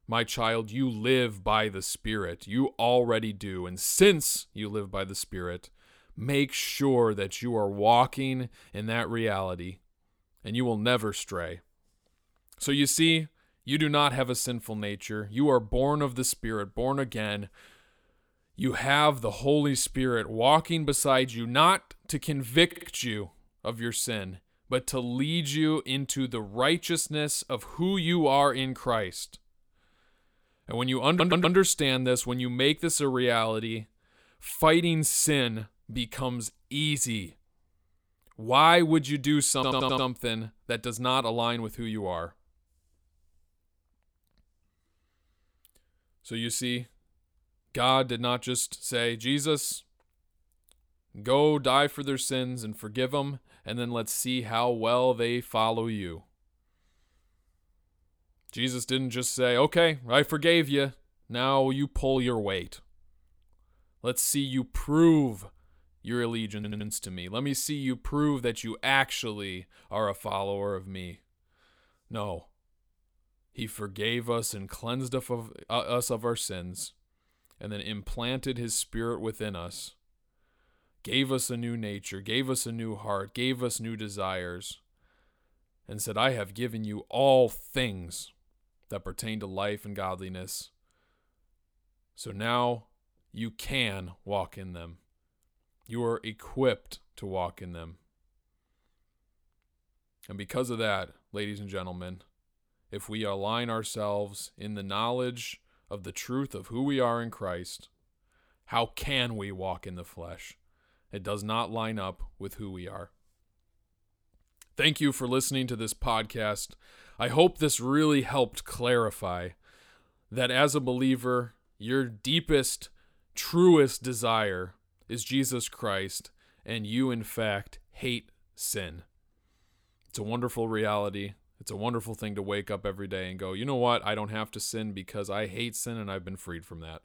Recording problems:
audio stuttering; 4 times, first at 23 s

